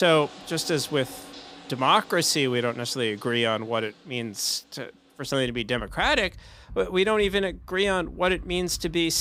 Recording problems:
household noises; faint; throughout; 20 dB below the speech
abrupt cut into speech; at the start and the end

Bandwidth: 15.5 kHz